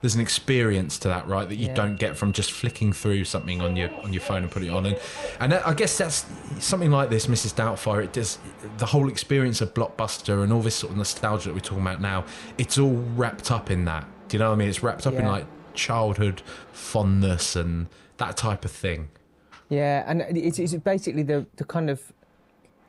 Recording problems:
train or aircraft noise; noticeable; throughout; 15 dB below the speech

